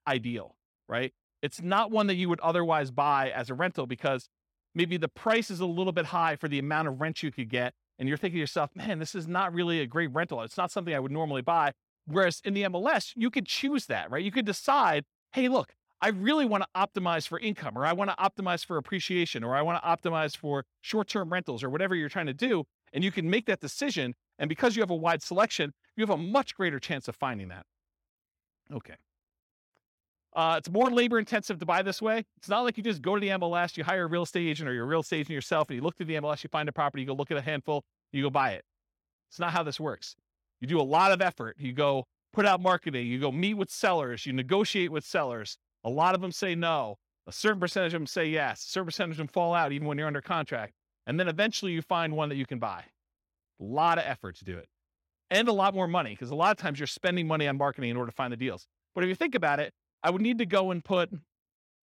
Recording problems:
none

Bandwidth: 16.5 kHz